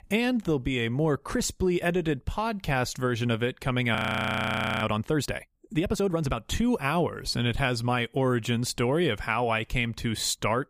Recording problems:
audio freezing; at 4 s for 1 s

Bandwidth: 15 kHz